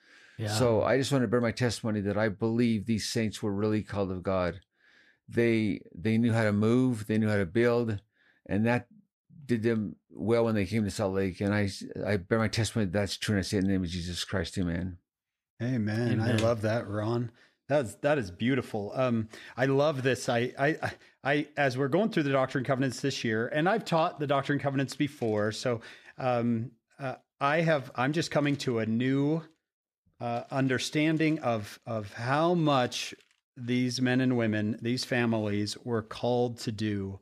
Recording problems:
none

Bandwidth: 14.5 kHz